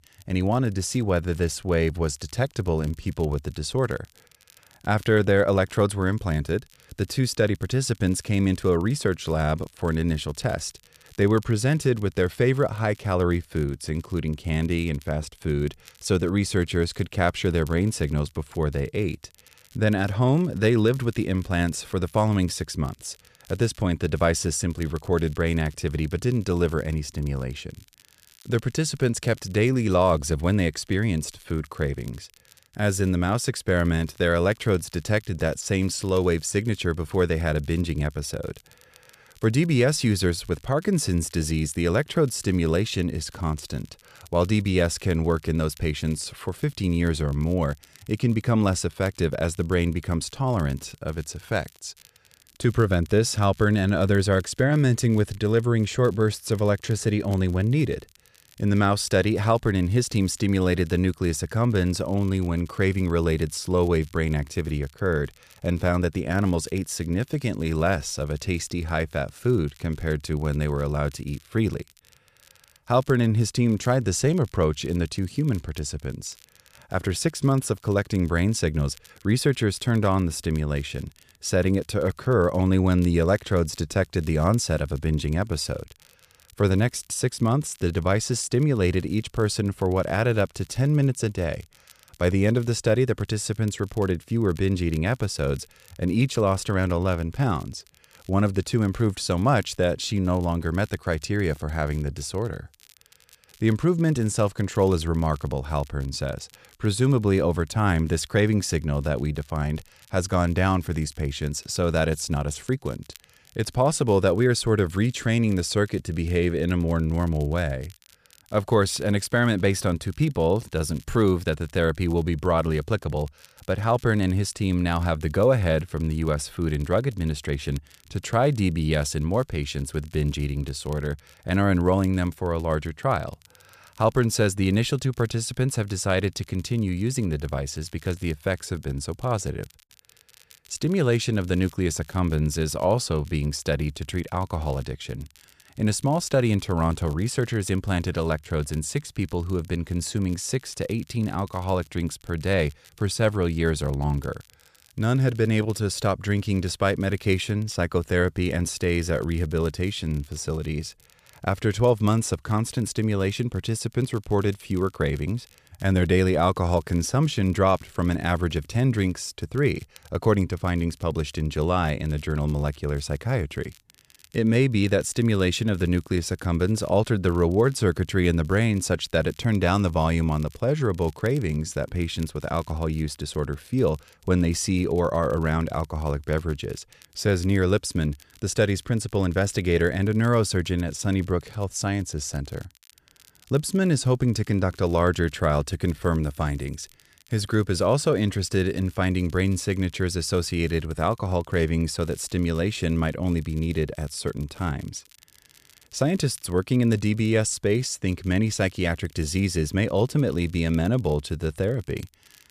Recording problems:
crackle, like an old record; faint; 30 dB below the speech

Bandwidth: 14.5 kHz